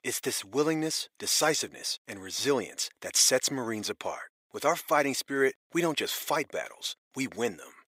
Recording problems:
thin; very; fading below 450 Hz

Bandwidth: 15.5 kHz